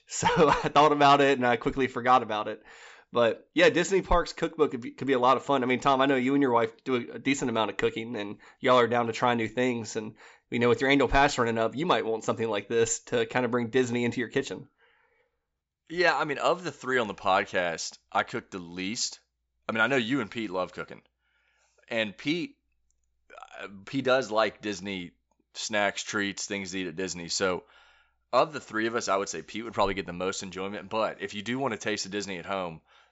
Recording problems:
high frequencies cut off; noticeable; nothing above 8 kHz

